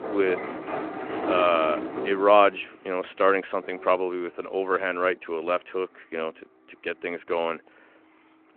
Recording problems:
phone-call audio
traffic noise; loud; throughout; 7 dB below the speech

